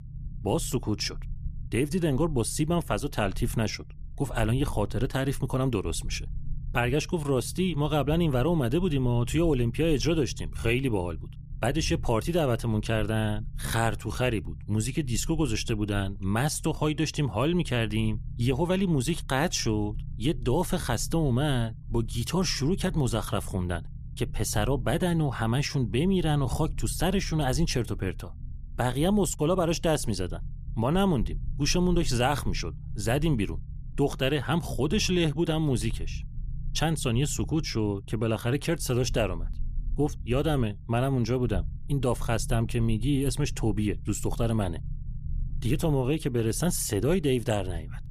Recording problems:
low rumble; faint; throughout; 25 dB below the speech

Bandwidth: 14.5 kHz